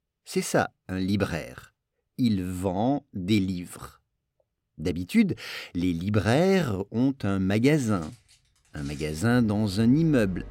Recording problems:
household noises; faint; from 7.5 s on; 25 dB below the speech

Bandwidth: 16.5 kHz